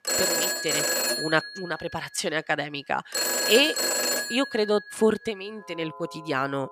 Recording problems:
alarms or sirens; very loud; throughout; 2 dB above the speech

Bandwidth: 14.5 kHz